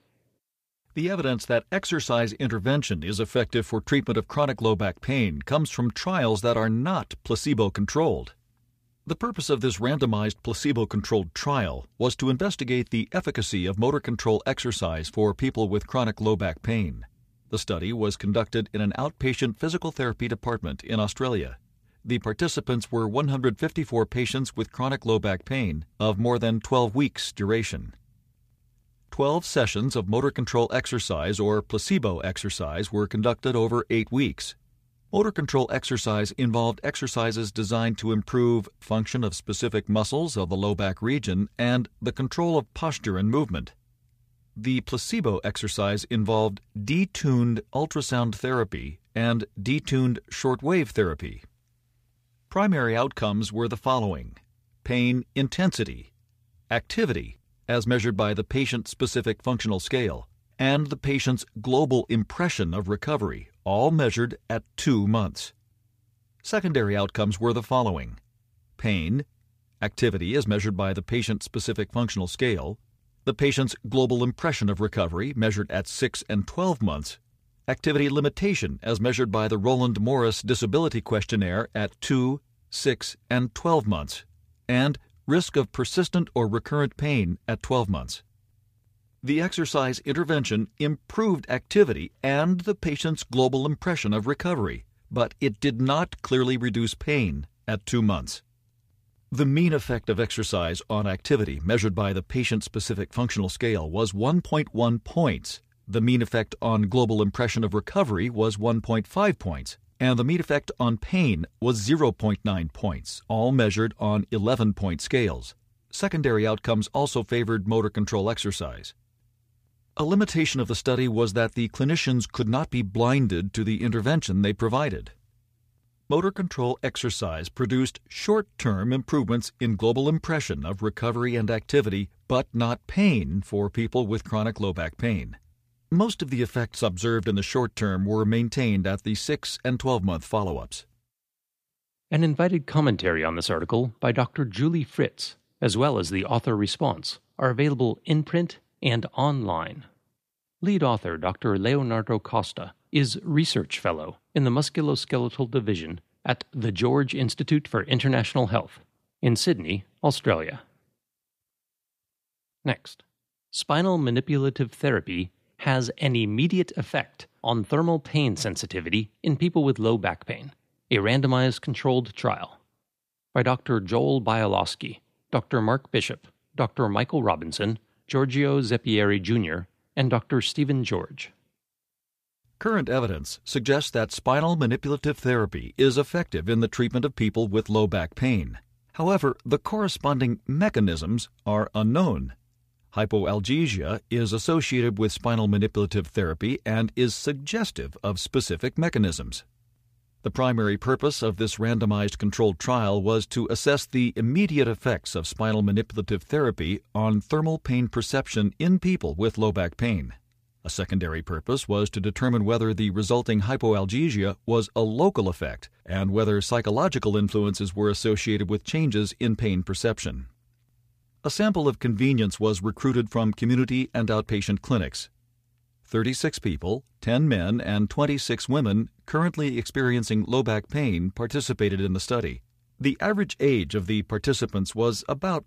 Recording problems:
none

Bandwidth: 15 kHz